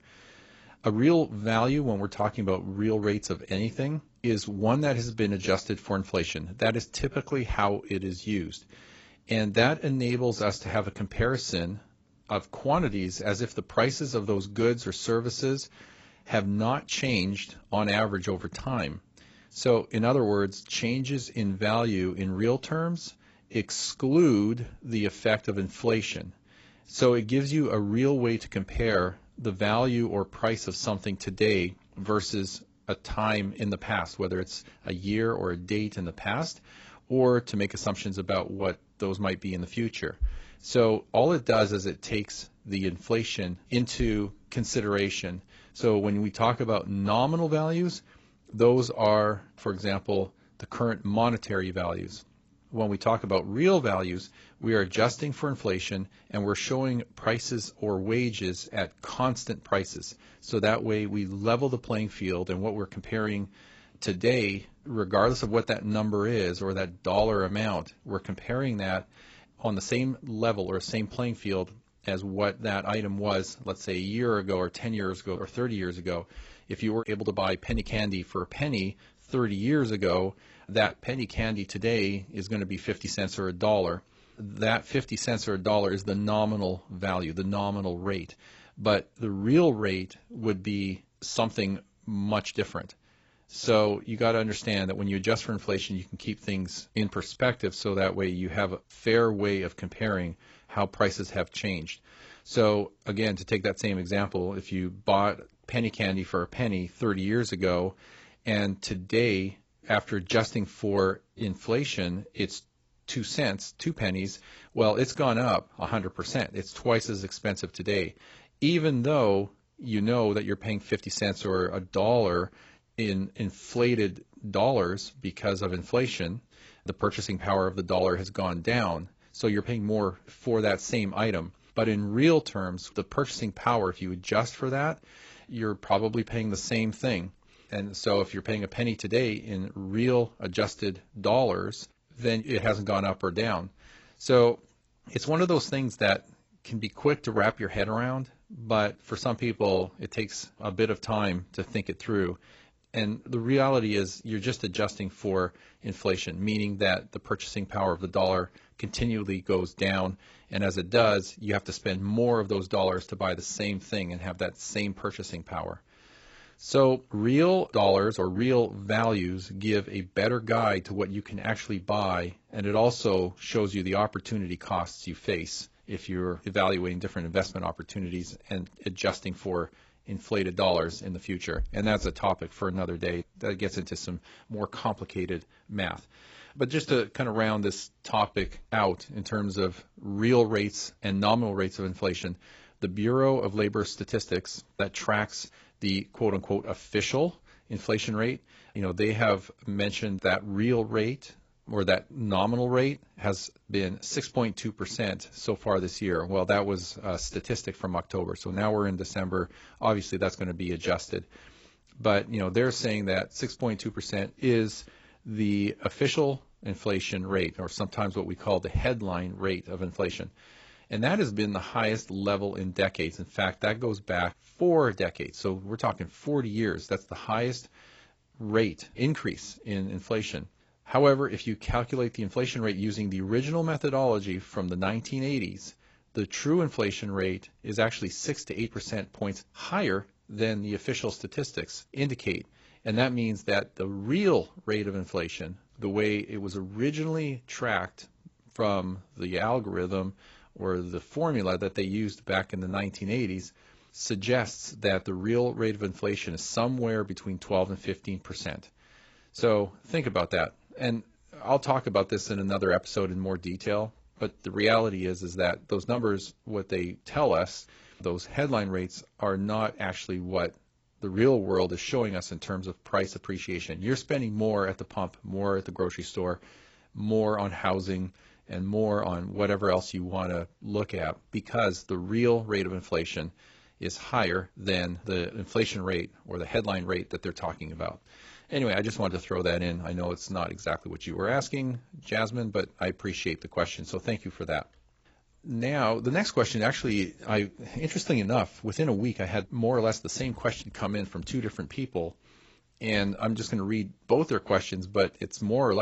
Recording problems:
garbled, watery; badly; nothing above 7.5 kHz
abrupt cut into speech; at the end

